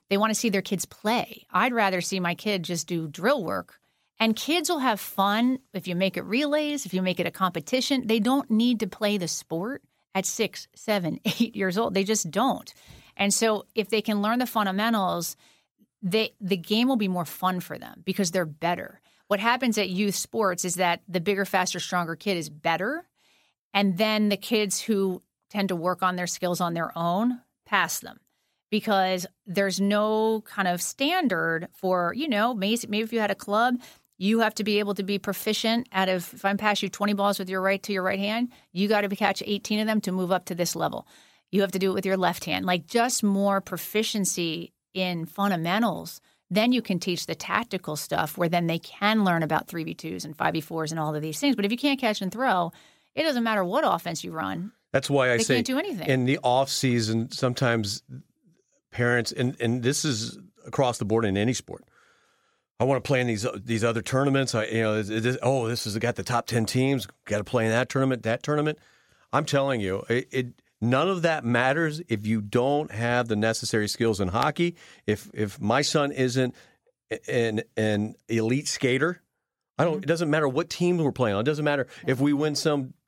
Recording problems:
none

